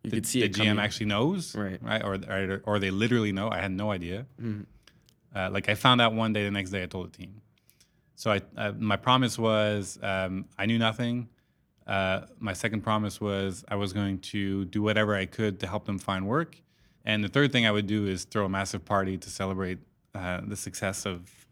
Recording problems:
none

